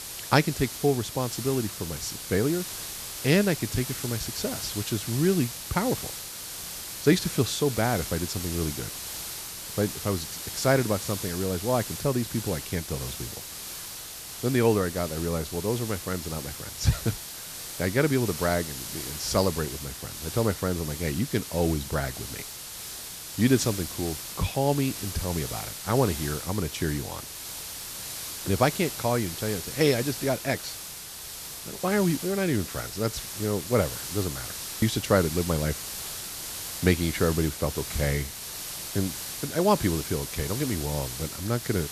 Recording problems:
hiss; loud; throughout; 7 dB below the speech

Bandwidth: 14 kHz